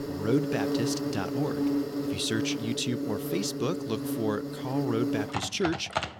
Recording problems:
animal sounds; loud; throughout; as loud as the speech

